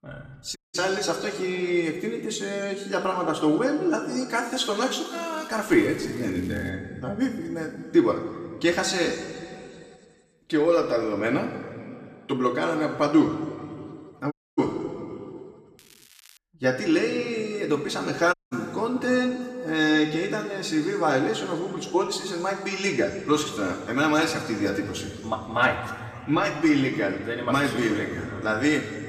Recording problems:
room echo; noticeable; dies away in 2 s
off-mic speech; somewhat distant
crackling; faint; from 5 to 6.5 s and at 16 s; 25 dB below the speech
audio cutting out; at 0.5 s, at 14 s and at 18 s

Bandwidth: 14.5 kHz